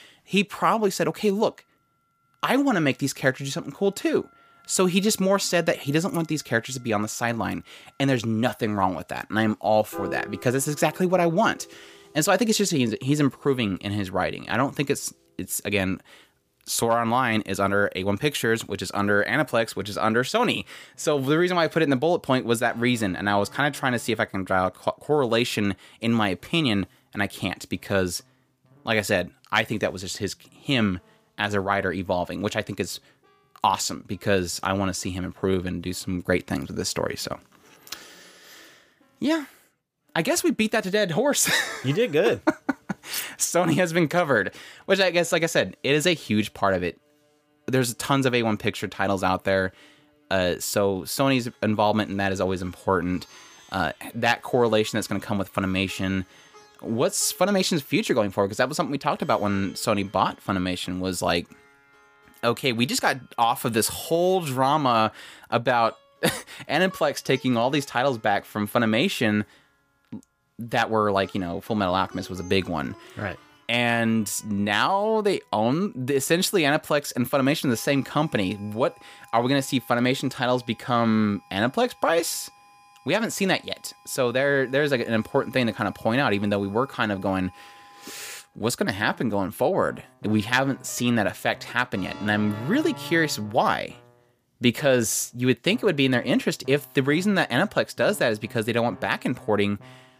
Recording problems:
background music; faint; throughout; 25 dB below the speech
clattering dishes; noticeable; at 43 s; peak 8 dB below the speech

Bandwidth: 15 kHz